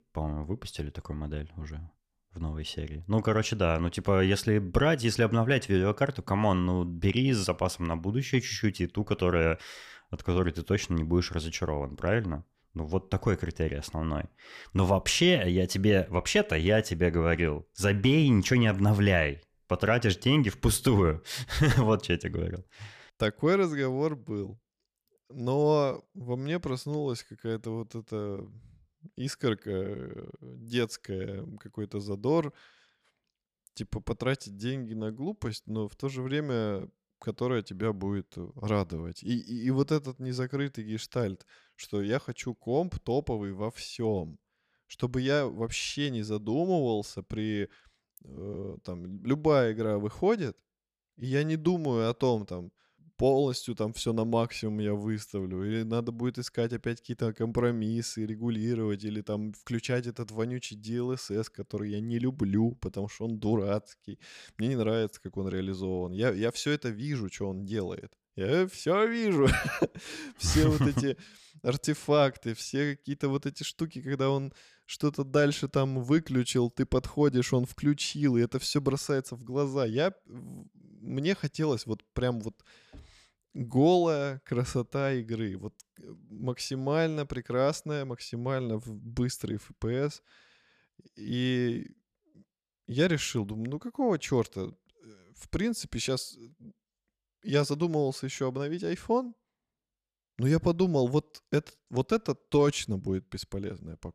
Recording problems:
none

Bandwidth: 14.5 kHz